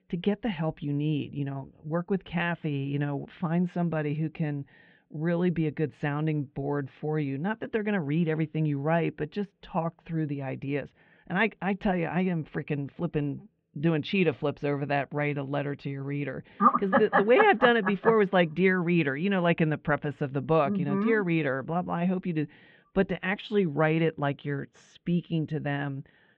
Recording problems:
muffled; very; fading above 3.5 kHz

